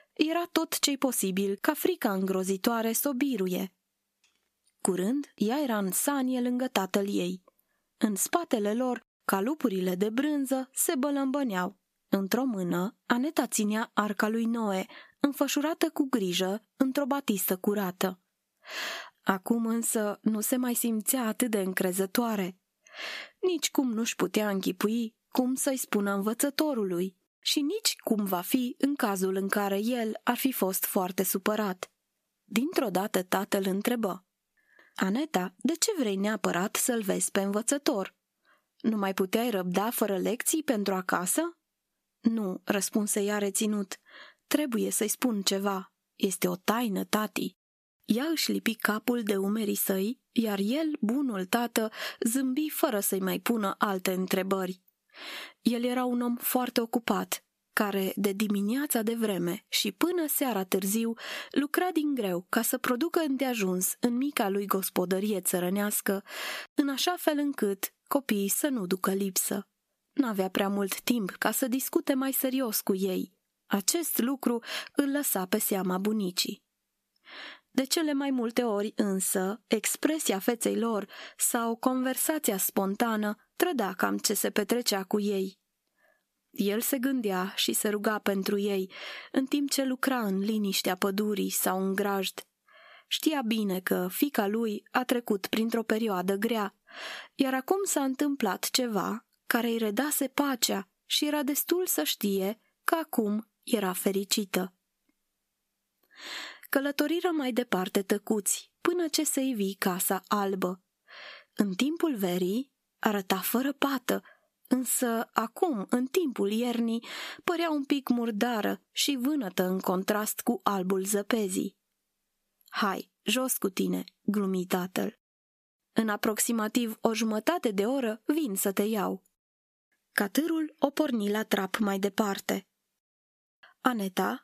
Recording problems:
squashed, flat; somewhat

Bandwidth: 14.5 kHz